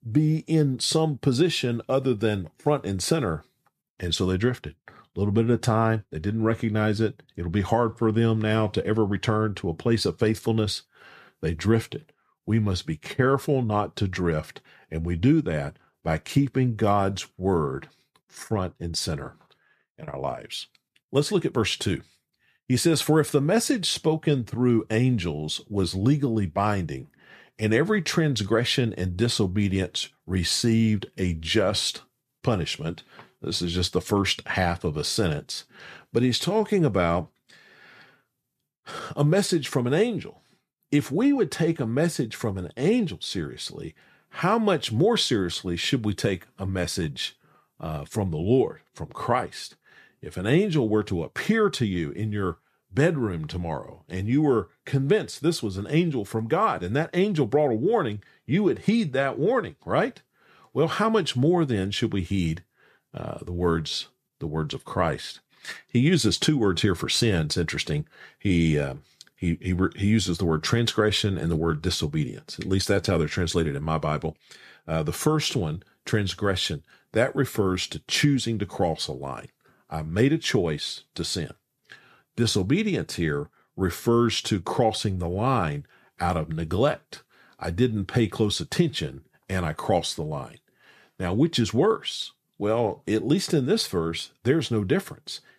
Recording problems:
none

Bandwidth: 14.5 kHz